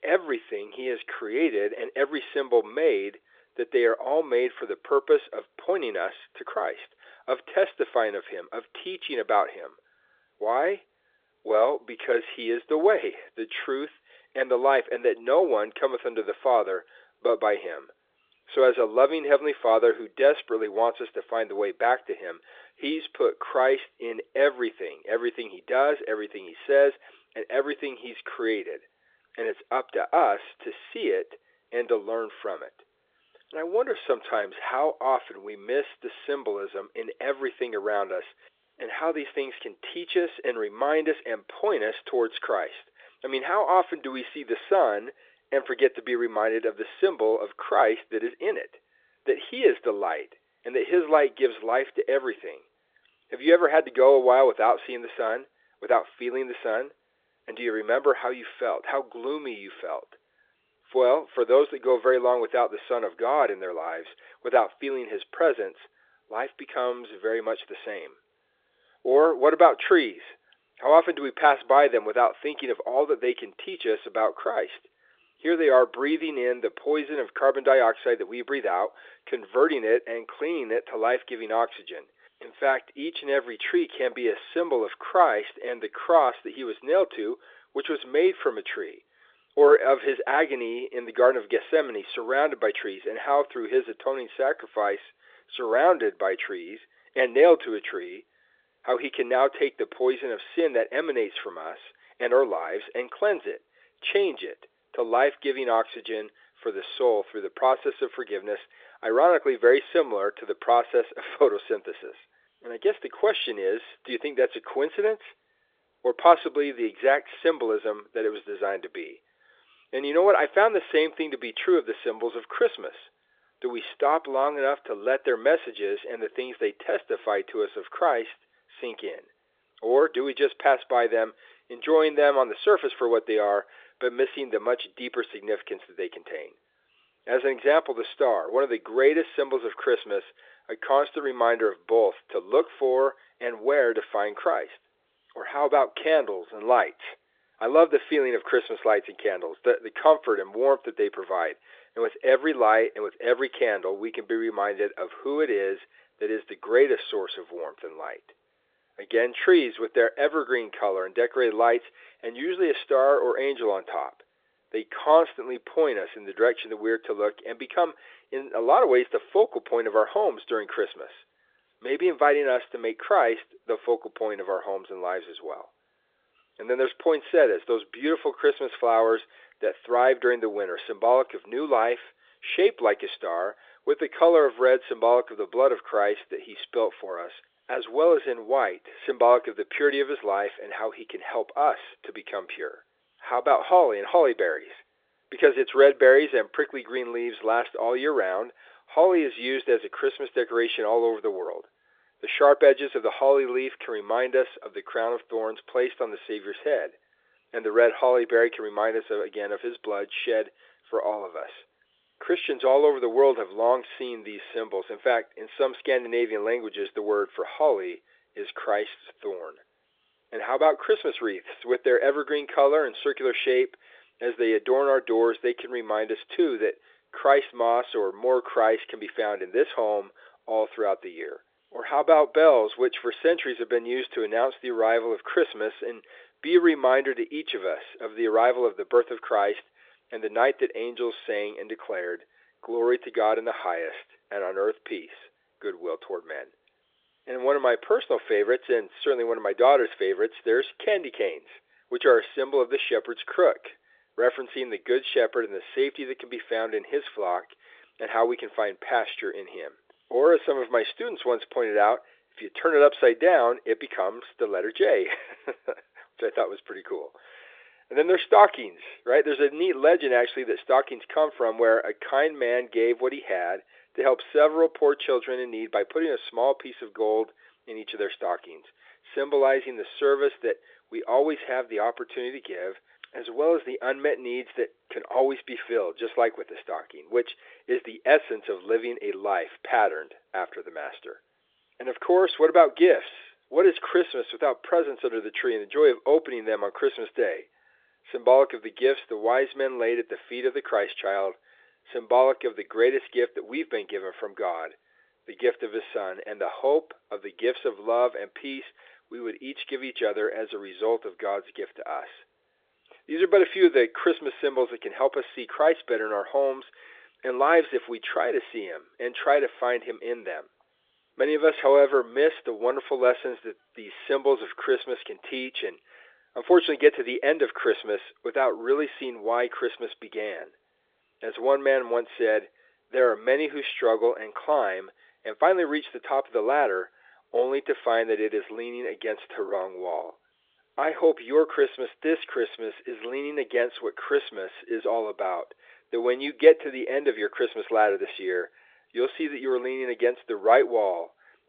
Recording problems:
phone-call audio

